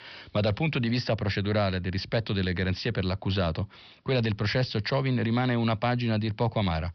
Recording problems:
high frequencies cut off; noticeable; nothing above 5.5 kHz

